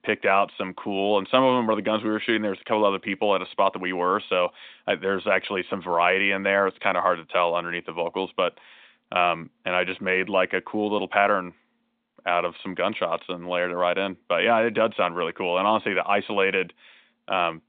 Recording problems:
phone-call audio; nothing above 3 kHz

